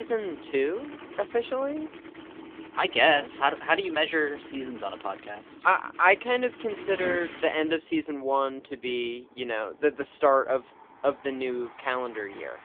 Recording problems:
phone-call audio; poor line
traffic noise; noticeable; throughout; 15 dB below the speech
abrupt cut into speech; at the start

